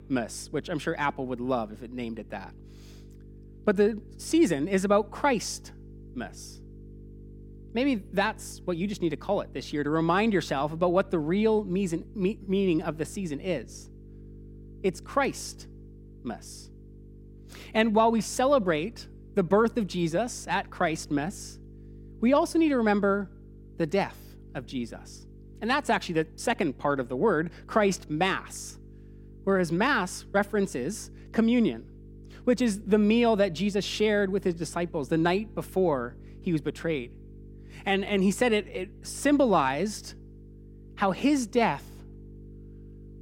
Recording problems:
electrical hum; faint; throughout; 50 Hz, 30 dB below the speech

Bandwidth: 16.5 kHz